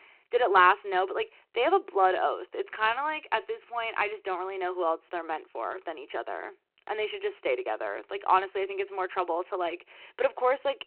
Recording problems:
phone-call audio; nothing above 4 kHz

